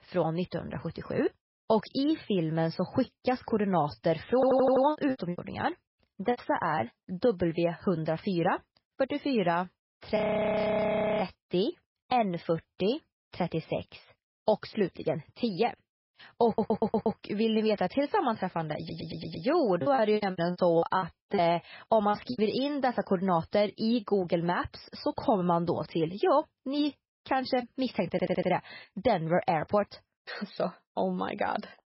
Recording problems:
garbled, watery; badly; nothing above 5.5 kHz
audio stuttering; 4 times, first at 4.5 s
choppy; very; from 5 to 6.5 s and from 20 to 22 s; 19% of the speech affected
audio freezing; at 10 s for 1 s

